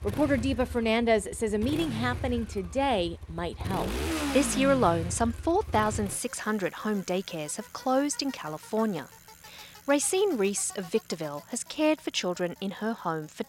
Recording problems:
traffic noise; loud; throughout; 9 dB below the speech

